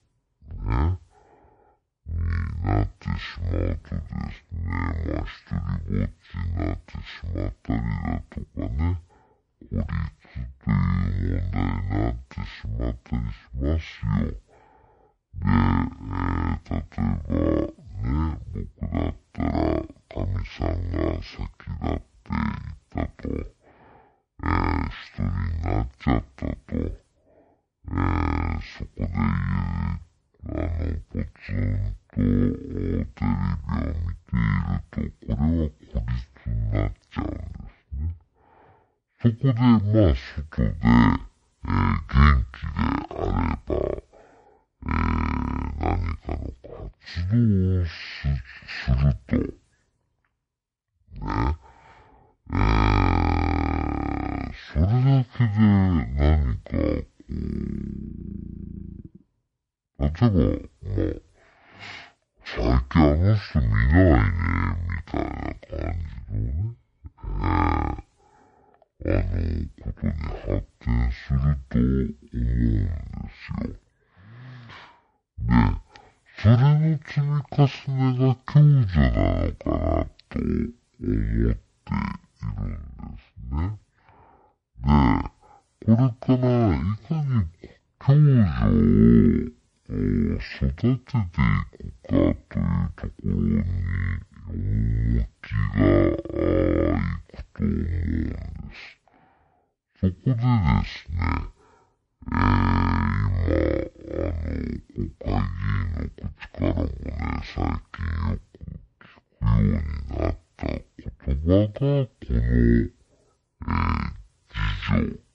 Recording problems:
wrong speed and pitch; too slow and too low; 0.5 times normal speed

